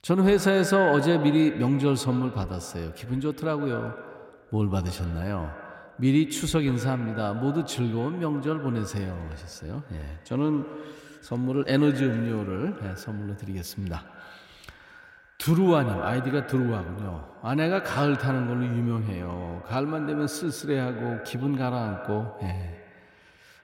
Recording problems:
echo of what is said; strong; throughout; 110 ms later, 10 dB below the speech

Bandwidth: 16 kHz